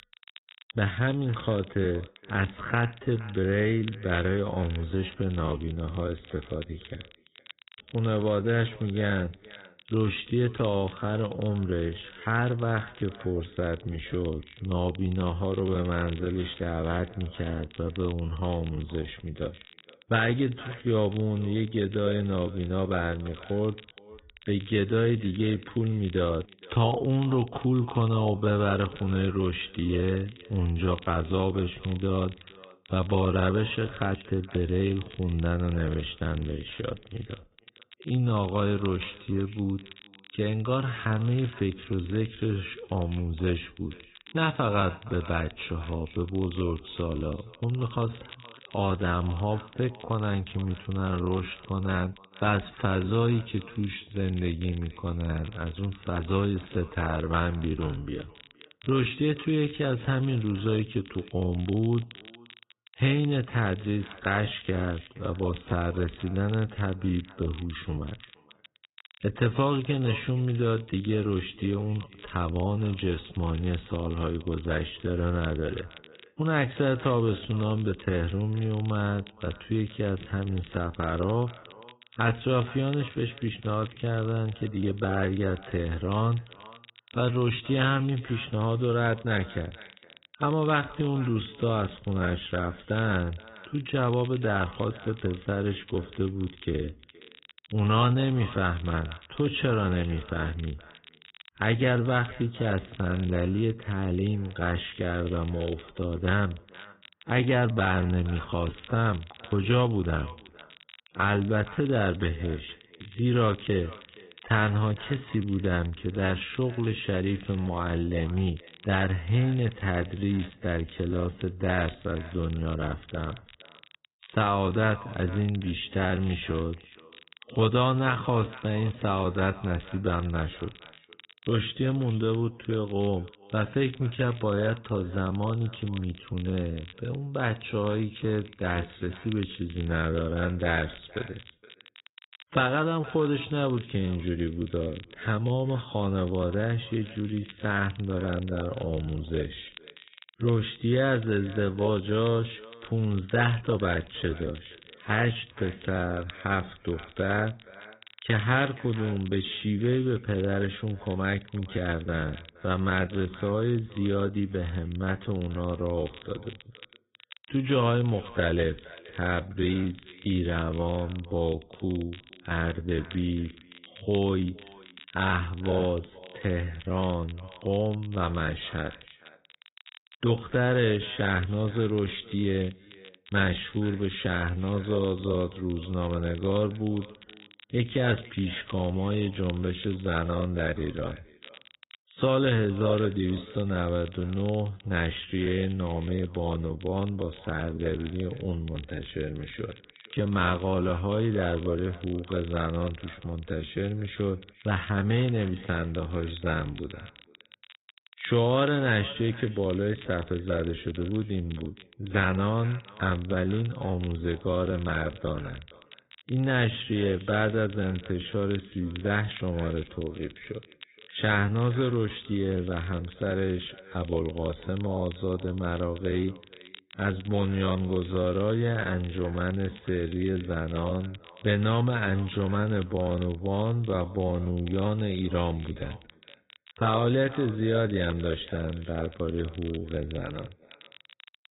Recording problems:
high frequencies cut off; severe; nothing above 4 kHz
wrong speed, natural pitch; too slow; 0.7 times normal speed
echo of what is said; faint; throughout; 470 ms later, 25 dB below the speech
garbled, watery; slightly
crackle, like an old record; faint; 20 dB below the speech

